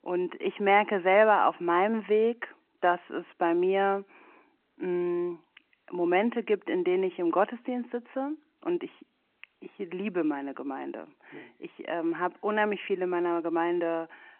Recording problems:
phone-call audio

